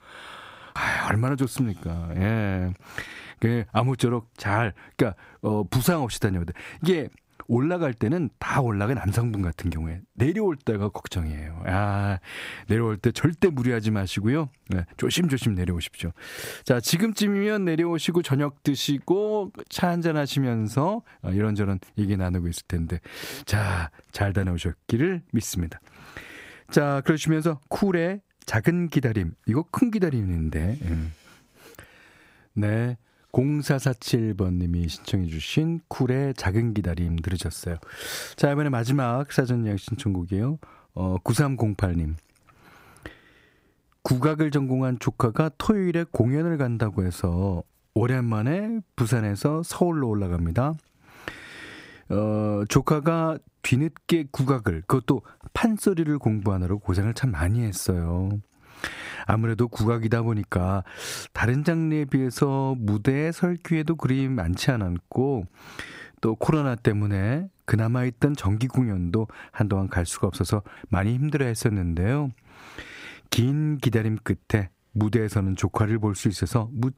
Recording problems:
squashed, flat; heavily

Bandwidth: 15.5 kHz